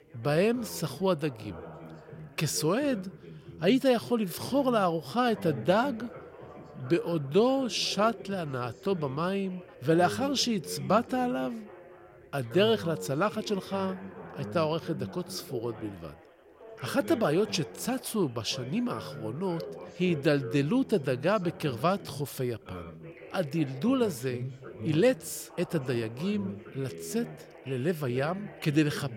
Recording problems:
background chatter; noticeable; throughout; 4 voices, 15 dB below the speech

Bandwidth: 16.5 kHz